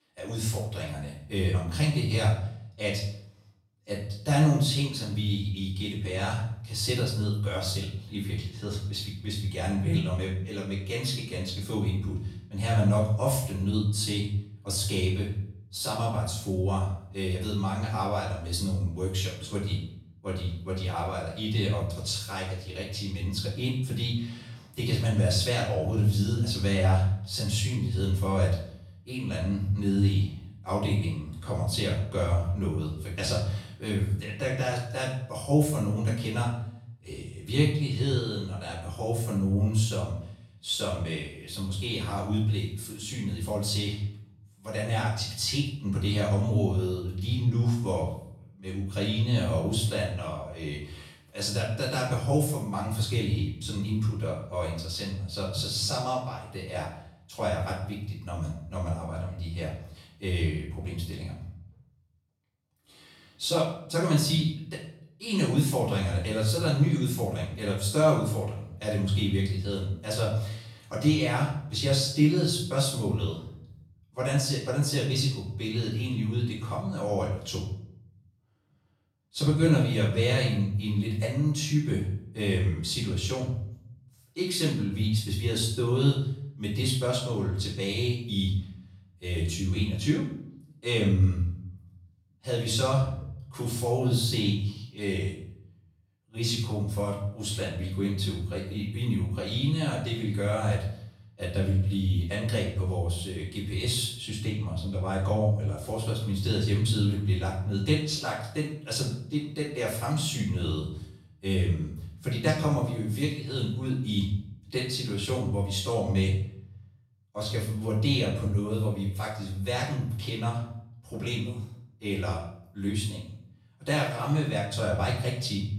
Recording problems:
off-mic speech; far
room echo; noticeable; dies away in 0.6 s

